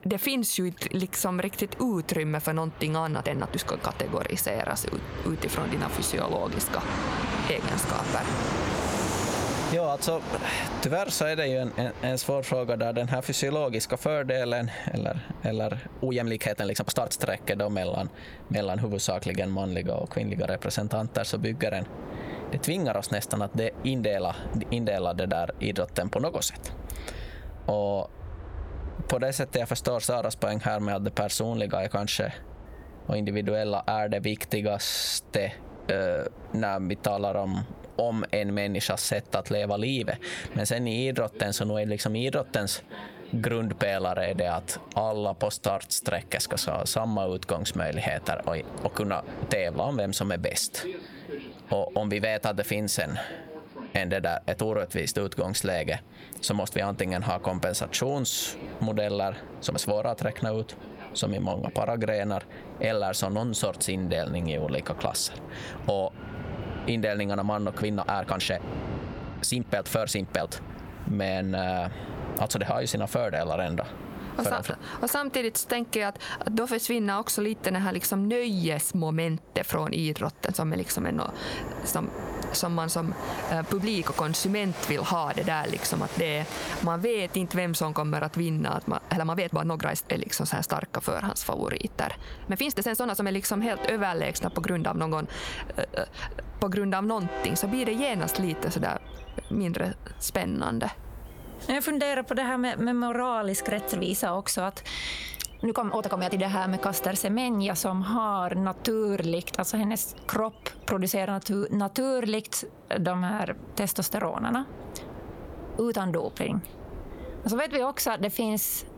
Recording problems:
squashed, flat; heavily, background pumping
train or aircraft noise; noticeable; throughout; 10 dB below the speech
uneven, jittery; strongly; from 3 s to 1:46

